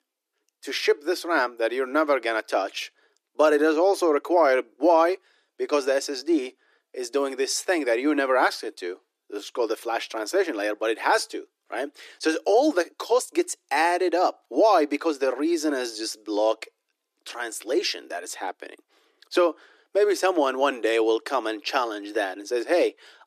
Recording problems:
thin; somewhat; fading below 300 Hz

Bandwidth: 14.5 kHz